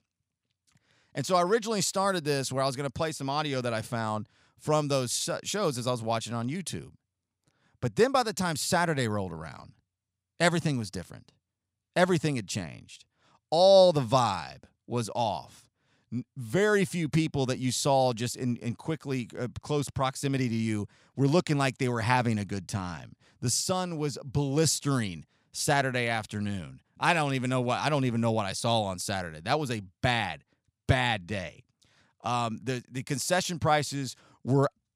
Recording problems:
none

